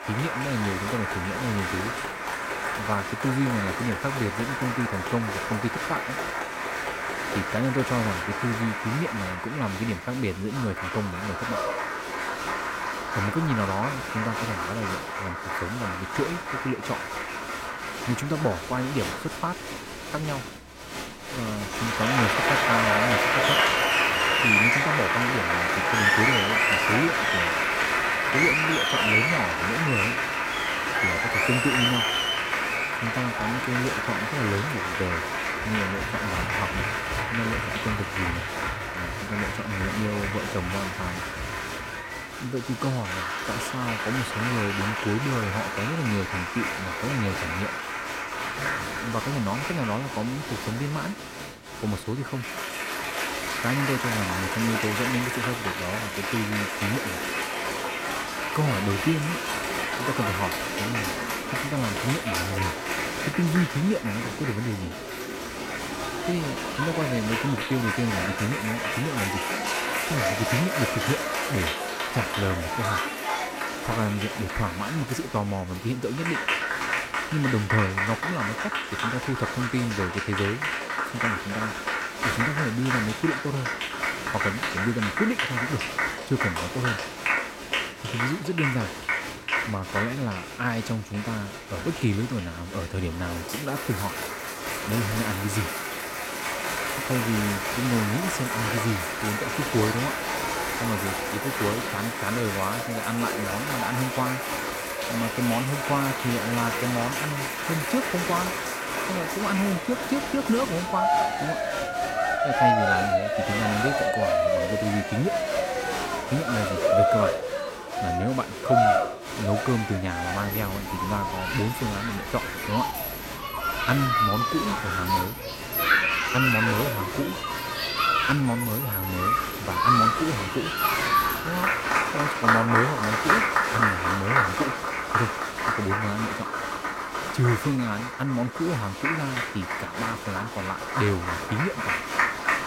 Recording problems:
crowd noise; very loud; throughout; 3 dB above the speech

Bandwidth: 16 kHz